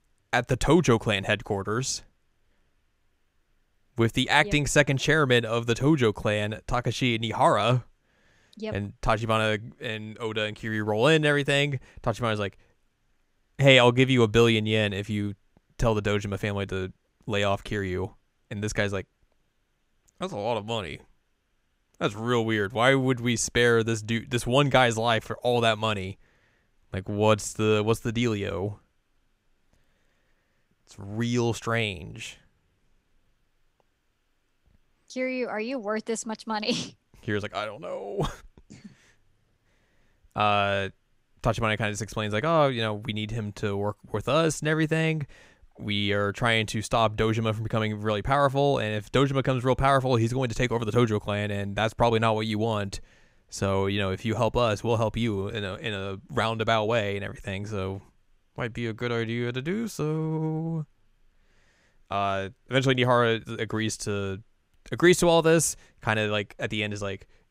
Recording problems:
none

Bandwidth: 15.5 kHz